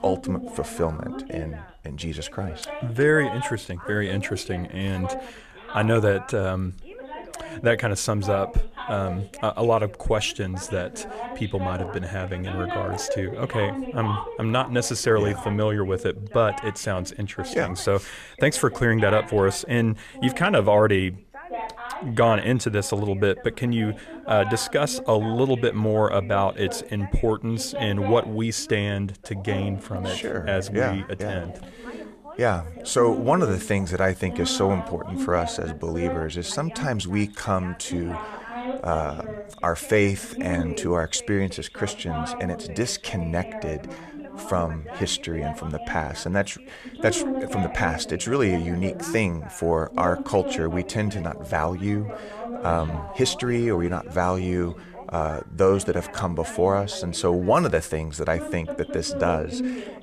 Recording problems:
background chatter; noticeable; throughout; 2 voices, 10 dB below the speech

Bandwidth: 14.5 kHz